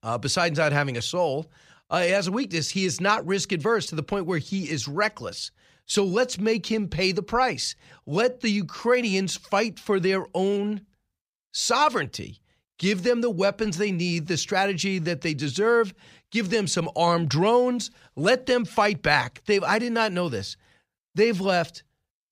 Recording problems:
none

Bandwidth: 15 kHz